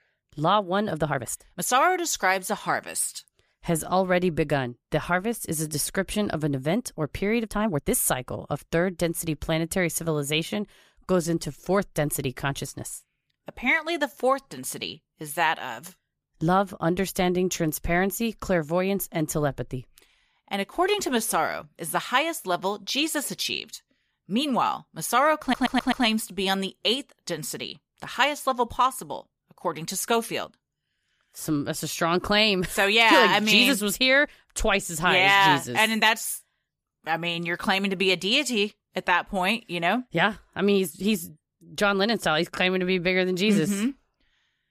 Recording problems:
uneven, jittery; strongly; from 1 to 43 s
audio stuttering; at 25 s

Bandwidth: 15 kHz